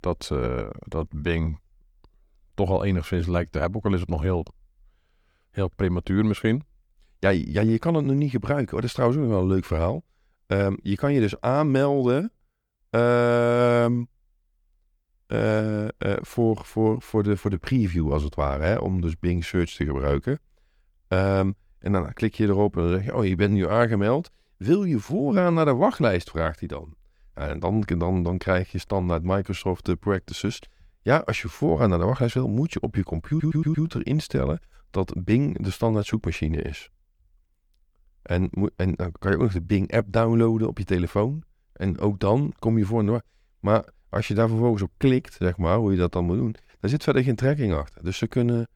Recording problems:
audio stuttering; at 33 s

